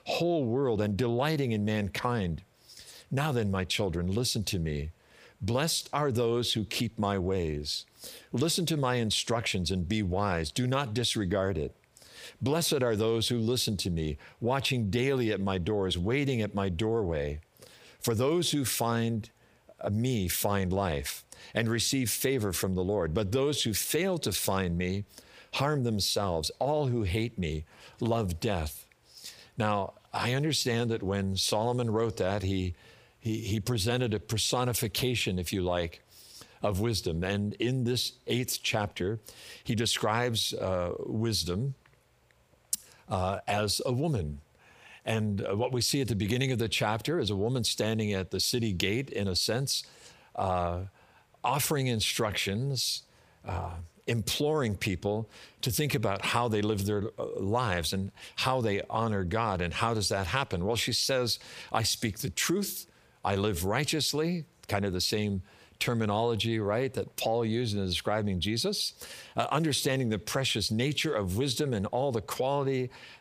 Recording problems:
squashed, flat; heavily

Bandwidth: 15 kHz